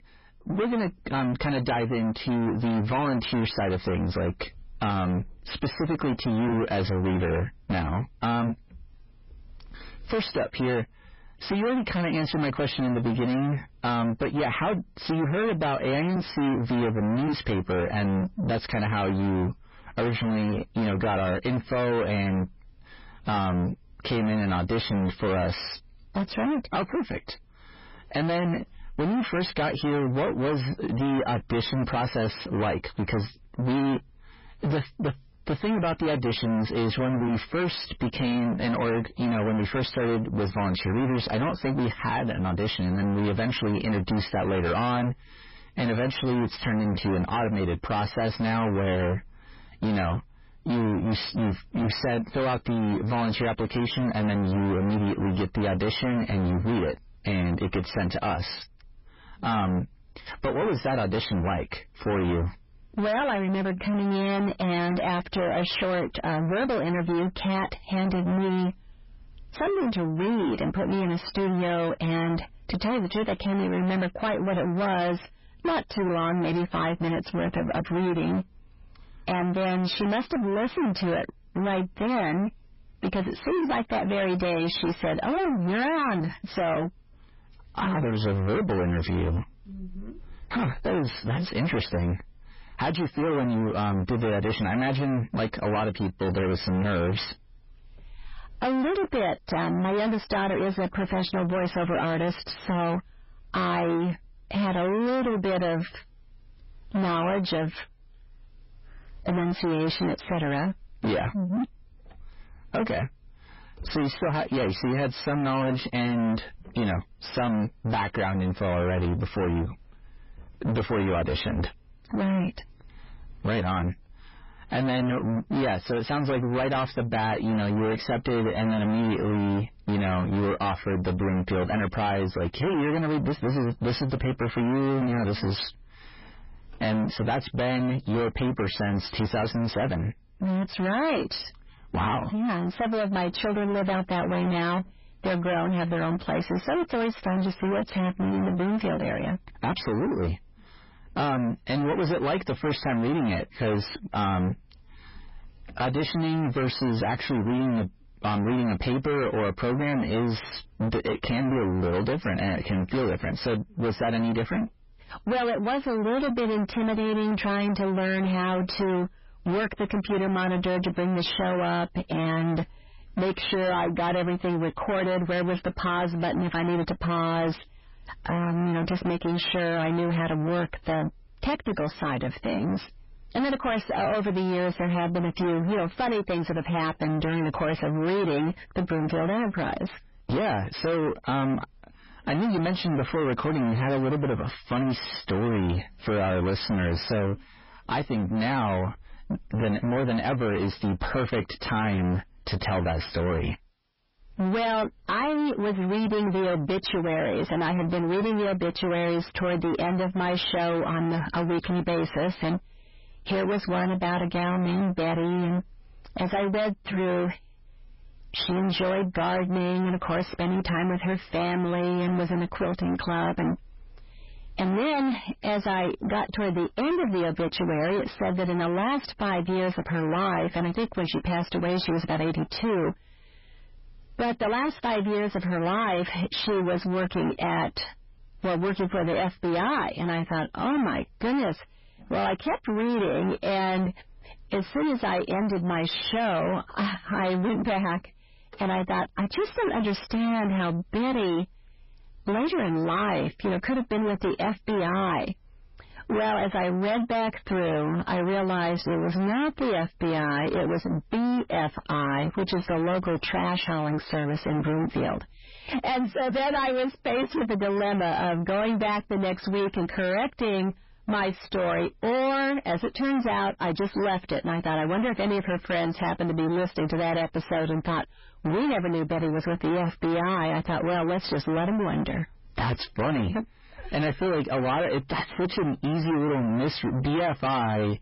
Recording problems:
distortion; heavy; 5 dB below the speech
garbled, watery; badly; nothing above 5.5 kHz

